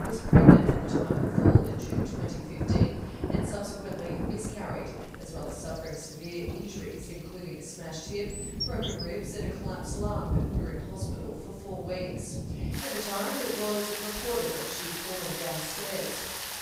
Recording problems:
room echo; strong; dies away in 1 s
off-mic speech; far
rain or running water; very loud; throughout; 9 dB above the speech
animal sounds; loud; throughout; 7 dB below the speech

